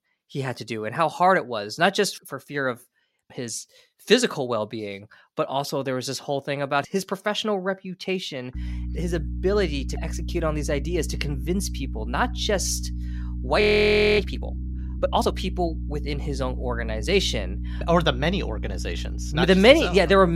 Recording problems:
electrical hum; faint; from 8.5 s on; 60 Hz, 20 dB below the speech
audio freezing; at 14 s for 0.5 s
abrupt cut into speech; at the end

